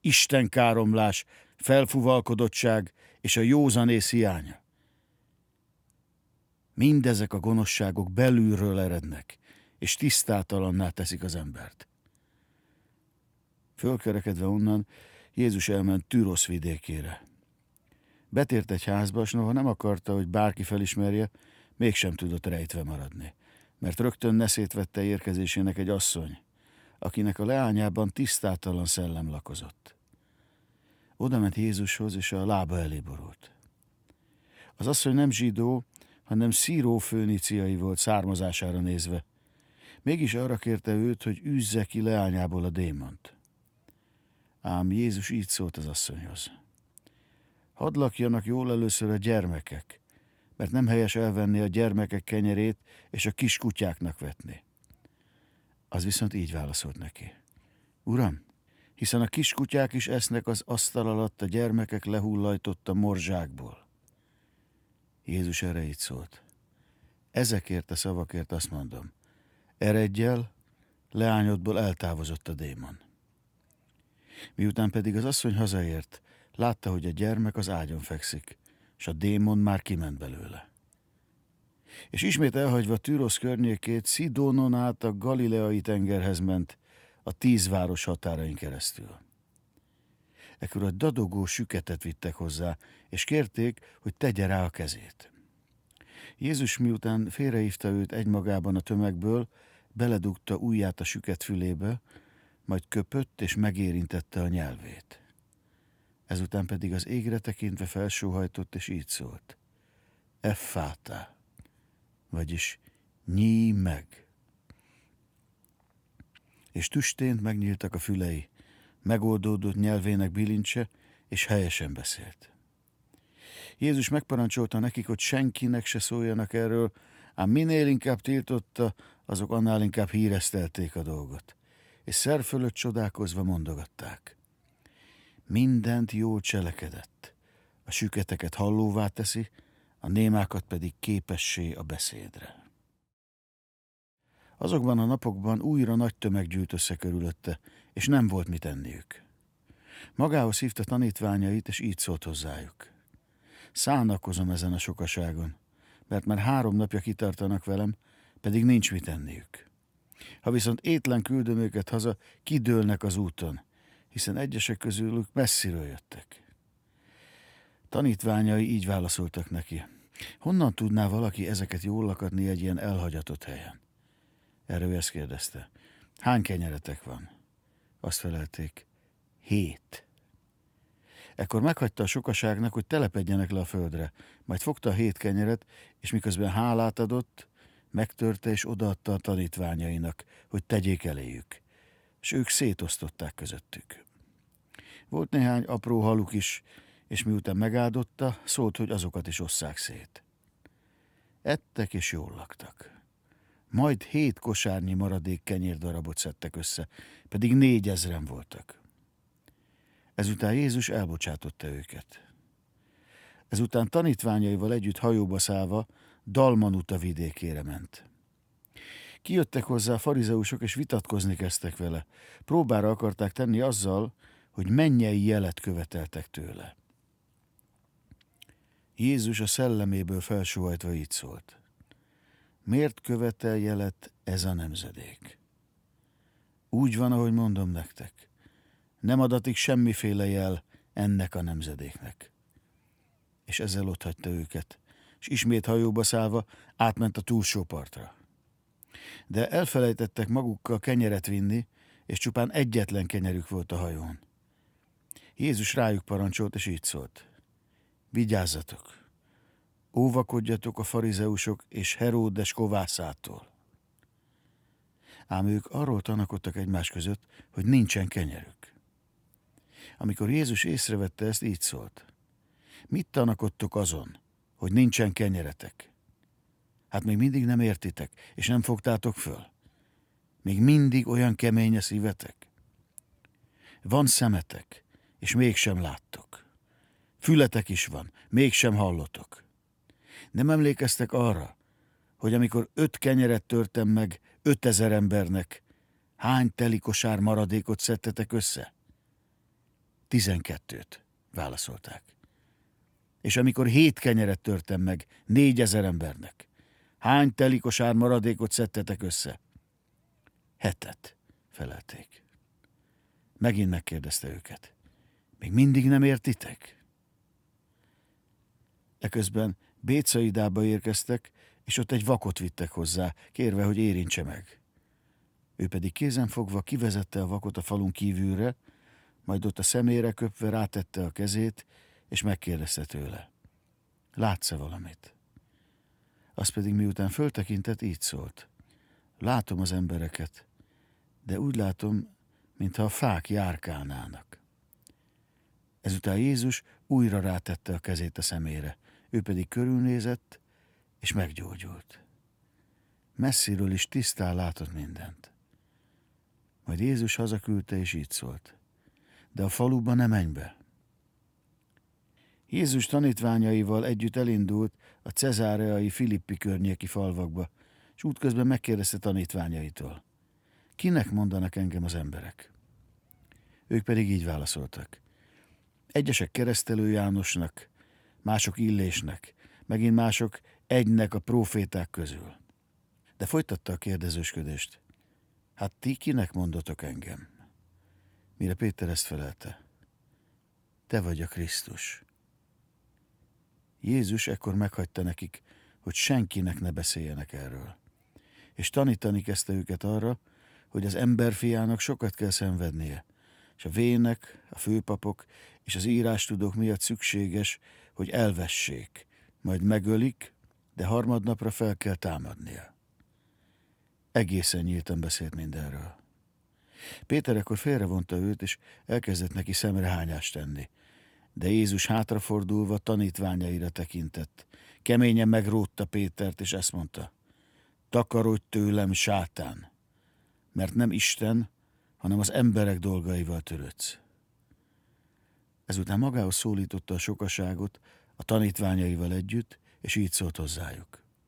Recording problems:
none

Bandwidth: 19 kHz